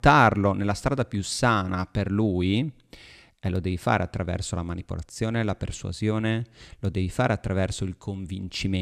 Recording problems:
abrupt cut into speech; at the end

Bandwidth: 14.5 kHz